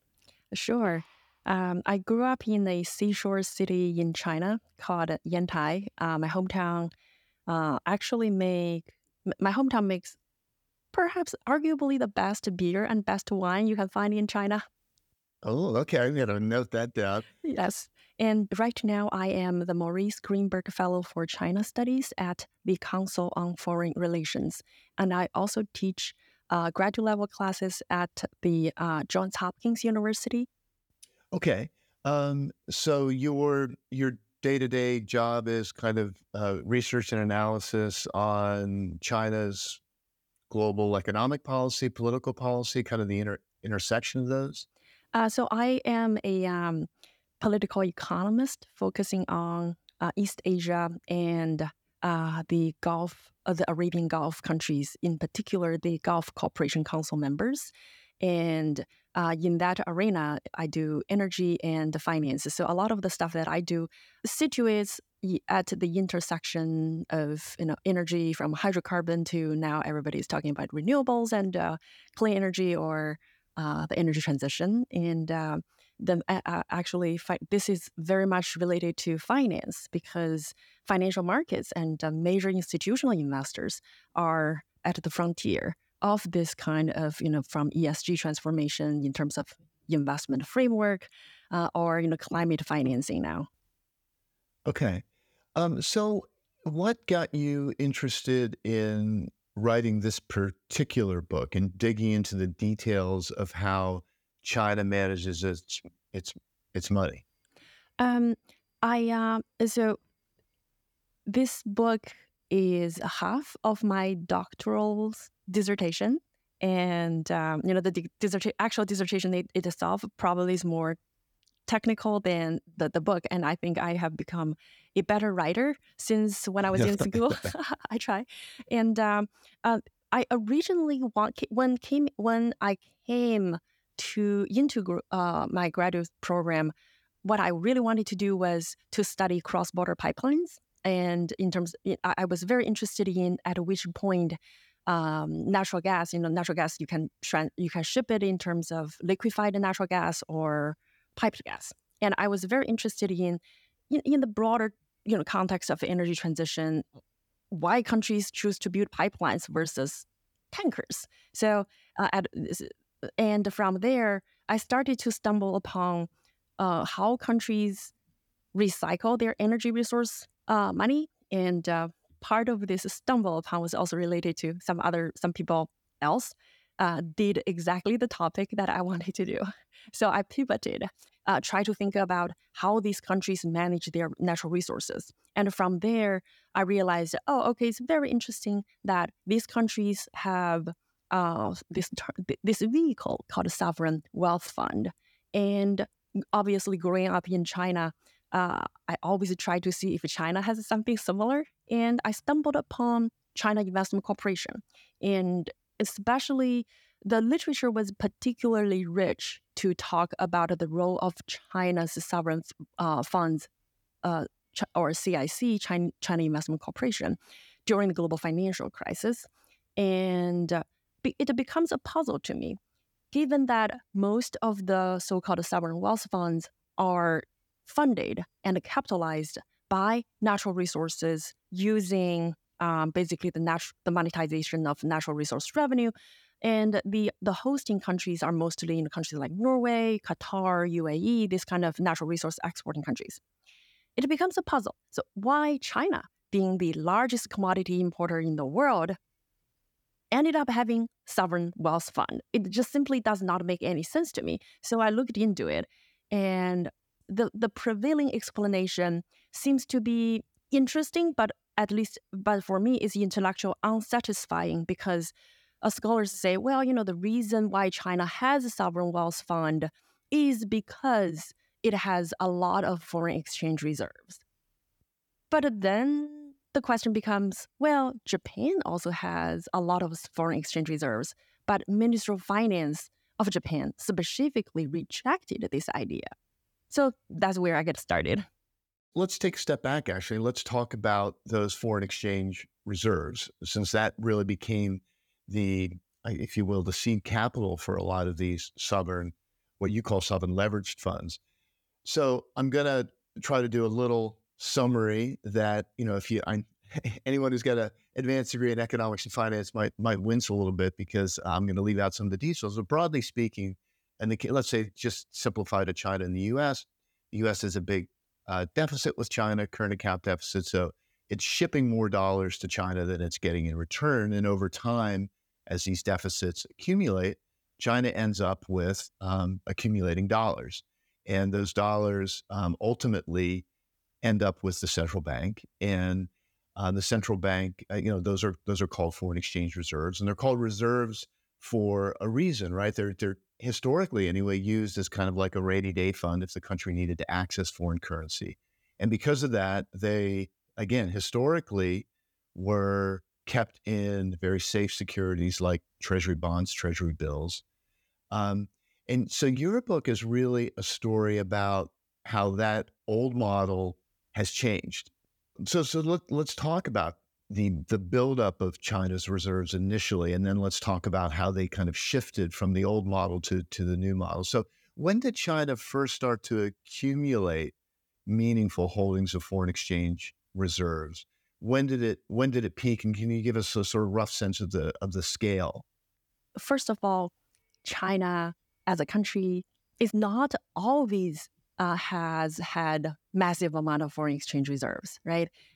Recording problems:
none

